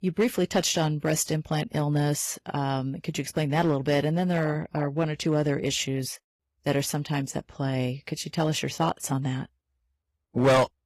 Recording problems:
distortion; slight; 2% of the sound clipped
garbled, watery; slightly; nothing above 12.5 kHz

